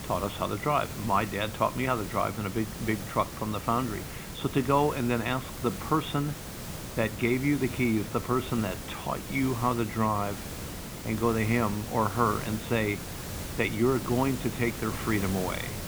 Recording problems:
high frequencies cut off; severe; nothing above 4 kHz
hiss; loud; throughout; 9 dB below the speech

